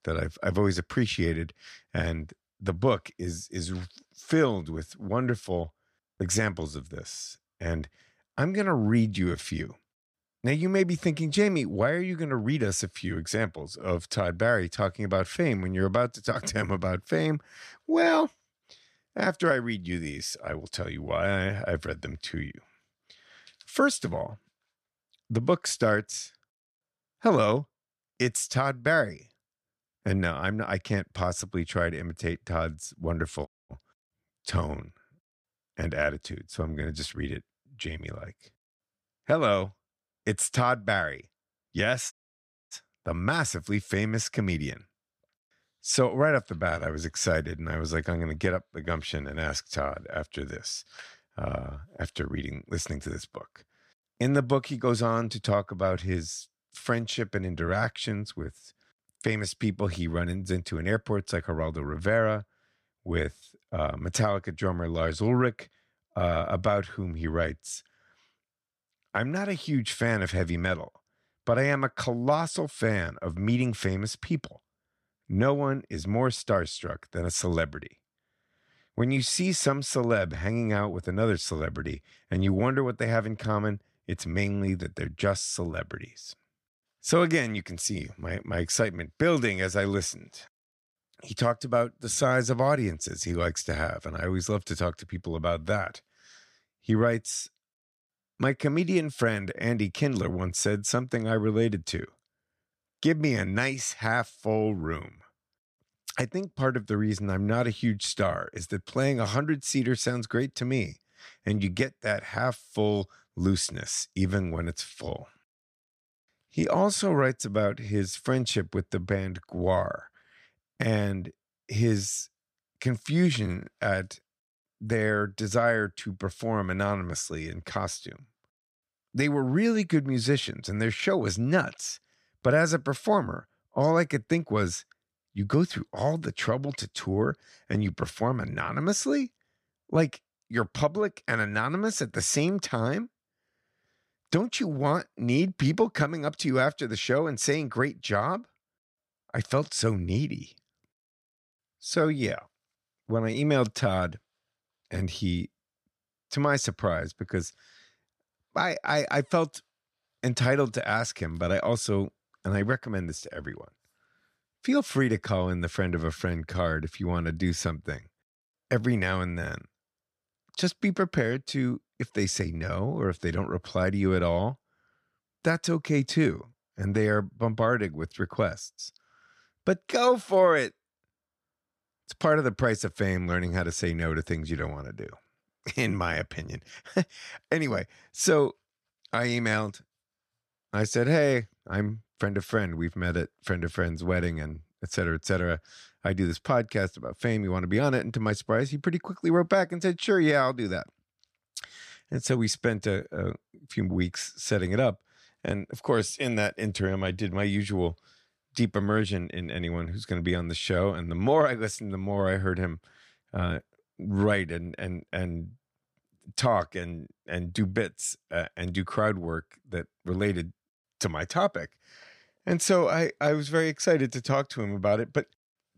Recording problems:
audio cutting out; at 33 s and at 42 s for 0.5 s

